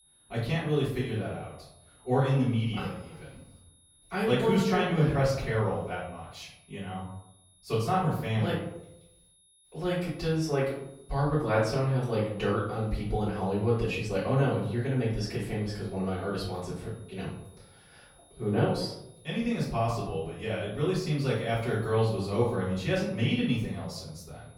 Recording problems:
off-mic speech; far
room echo; noticeable; dies away in 0.7 s
high-pitched whine; faint; throughout; 10.5 kHz, 30 dB below the speech

